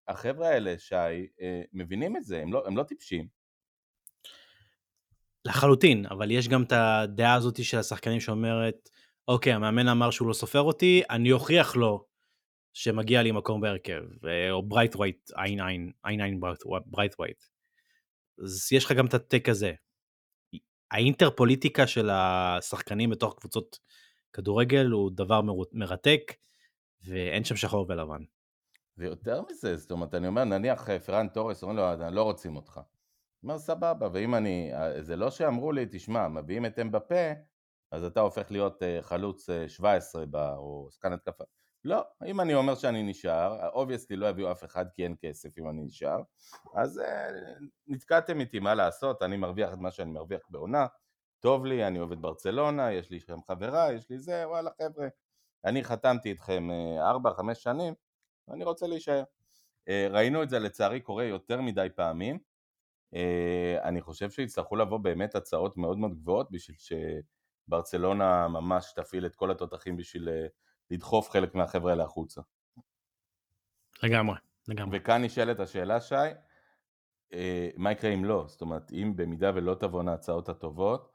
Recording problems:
none

